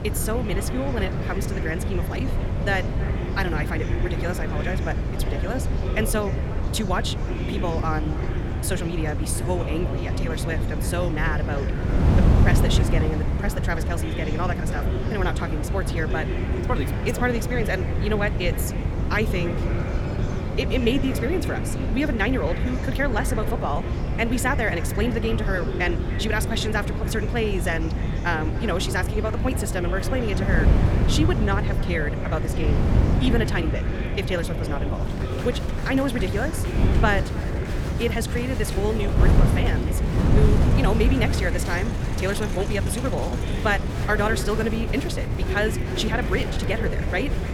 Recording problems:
wrong speed, natural pitch; too fast; 1.5 times normal speed
echo of what is said; noticeable; throughout; 300 ms later, 20 dB below the speech
wind noise on the microphone; heavy; 7 dB below the speech
murmuring crowd; loud; throughout; 8 dB below the speech
dog barking; faint; from 19 to 21 s; peak 15 dB below the speech

